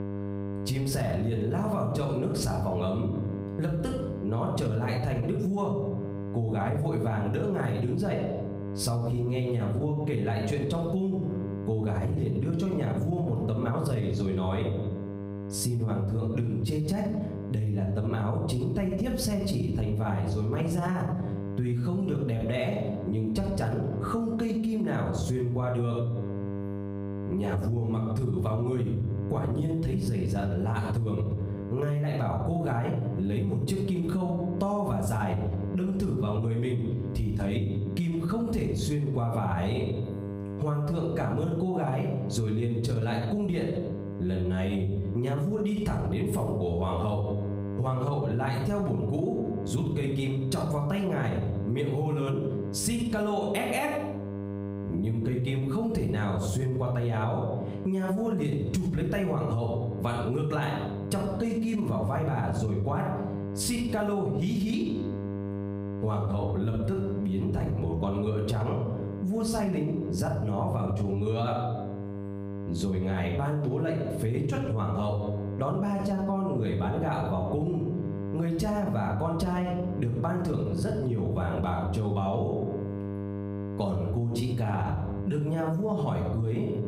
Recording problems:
room echo; slight; dies away in 0.6 s
off-mic speech; somewhat distant
squashed, flat; somewhat
electrical hum; noticeable; throughout; 50 Hz, 15 dB below the speech

